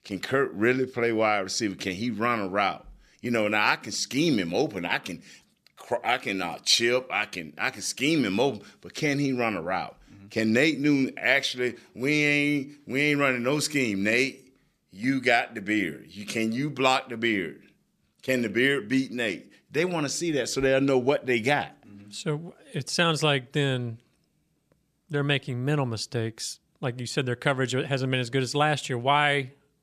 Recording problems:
none

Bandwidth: 14.5 kHz